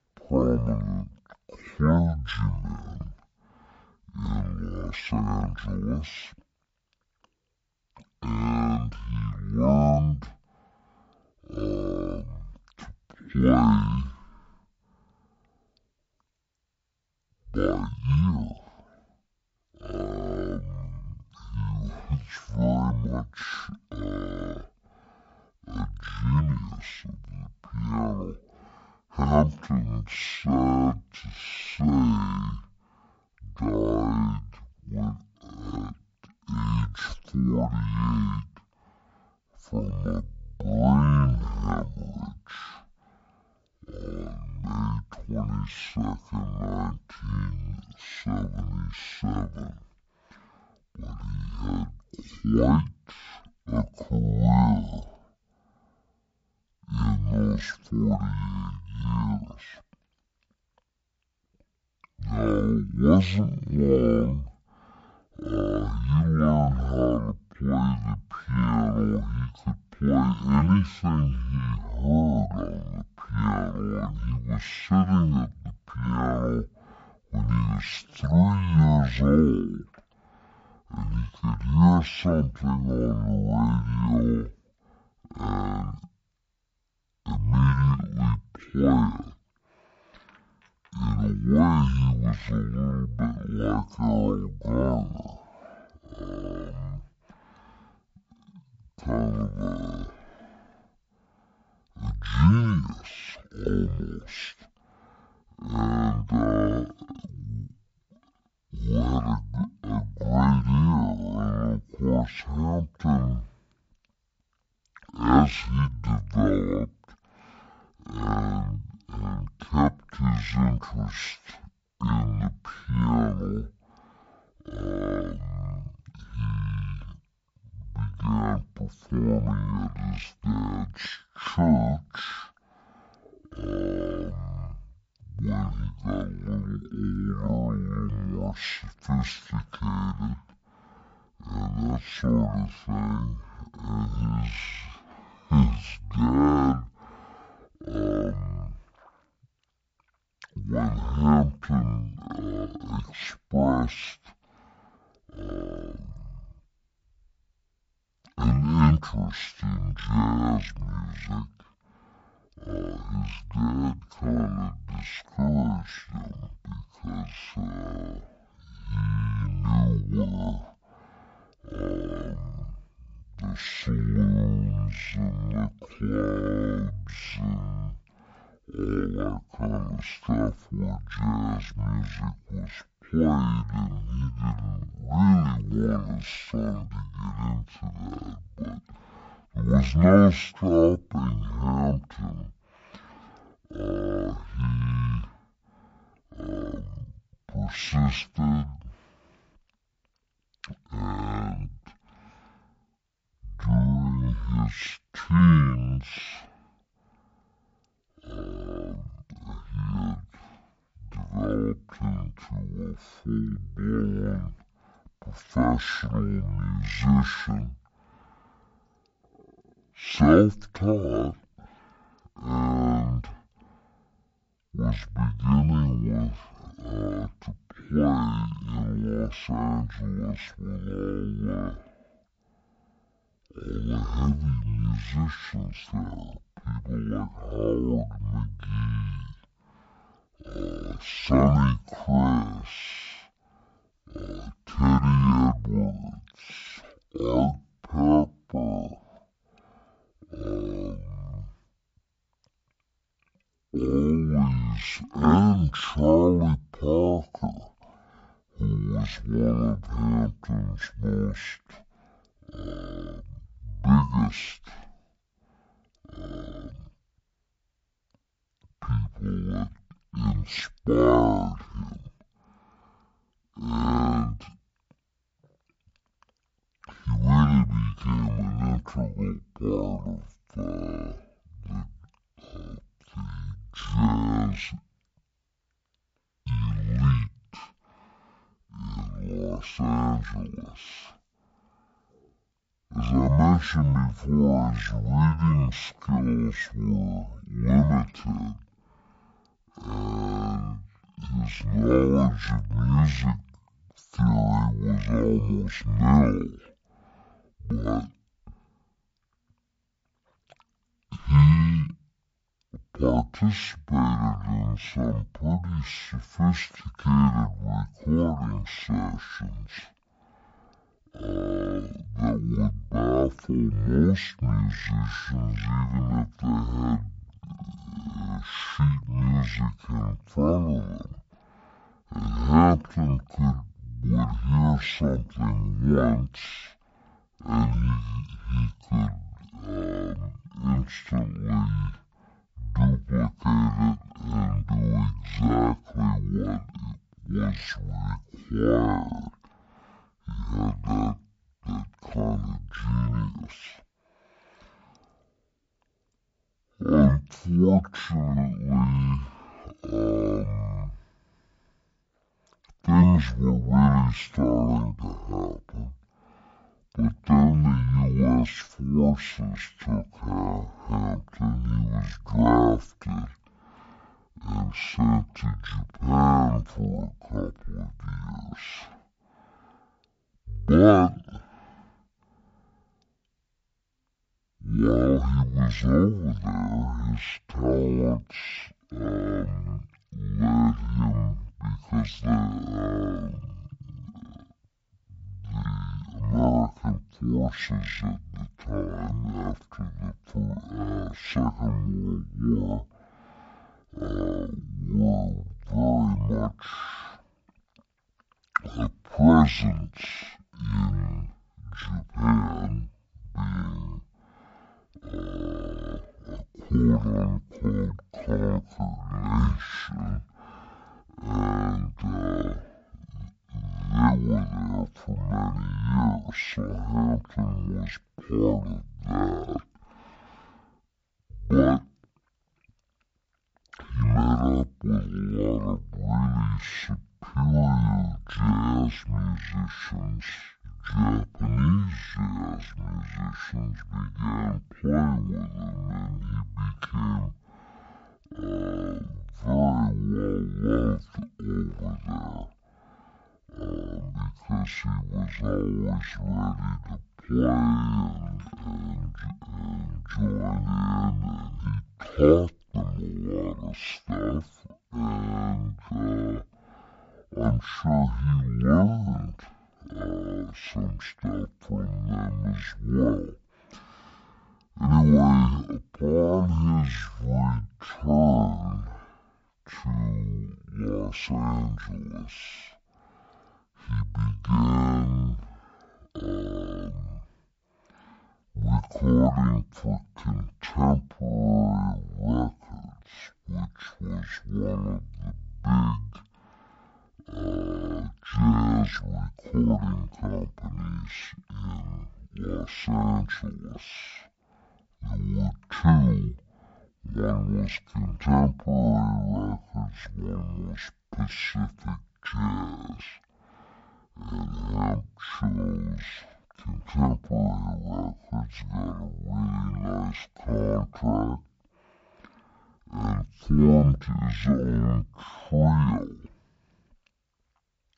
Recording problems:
wrong speed and pitch; too slow and too low; 0.5 times normal speed

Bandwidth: 7.5 kHz